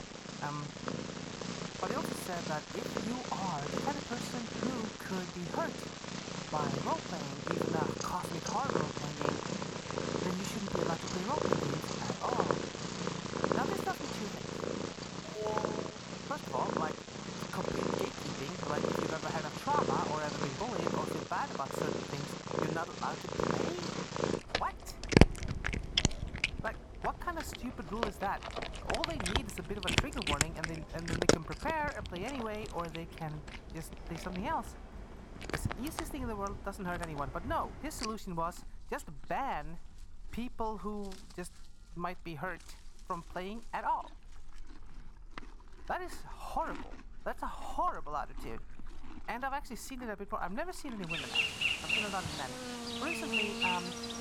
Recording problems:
animal sounds; very loud; throughout; 4 dB above the speech
alarm; loud; at 15 s; peak 1 dB above the speech

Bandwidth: 17.5 kHz